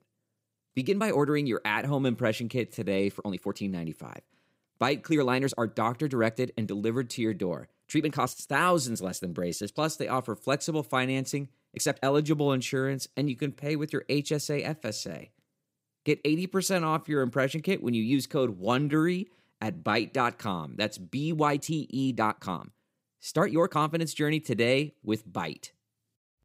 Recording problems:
uneven, jittery; strongly; from 0.5 to 24 s

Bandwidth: 15.5 kHz